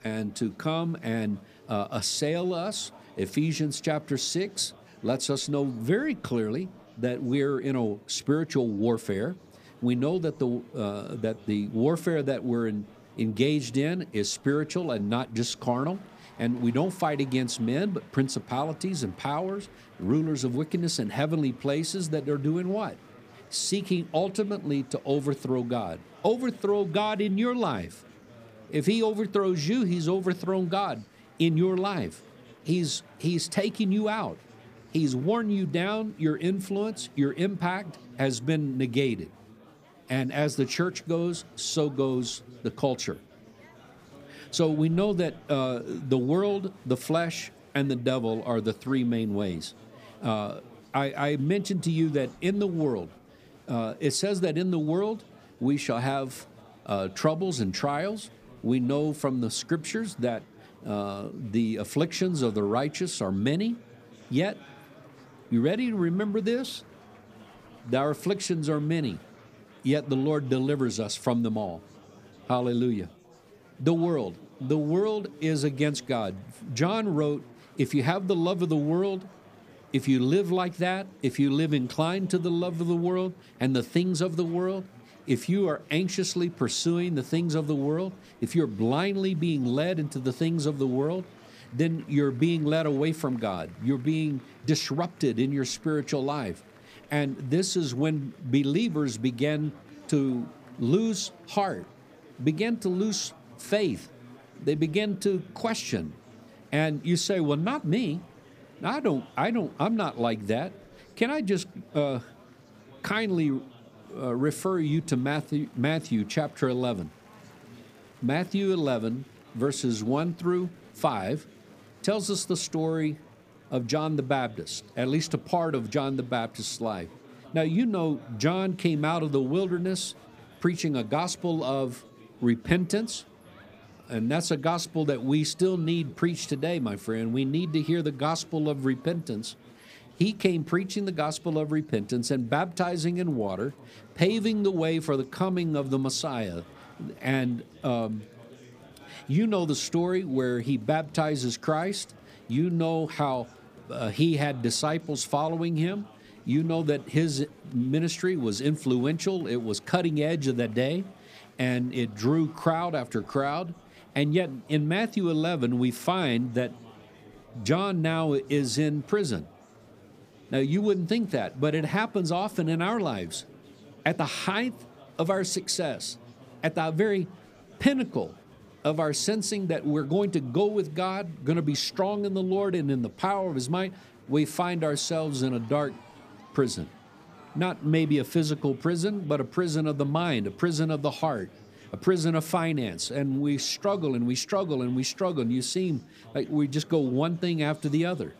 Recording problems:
murmuring crowd; faint; throughout; 25 dB below the speech

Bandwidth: 15 kHz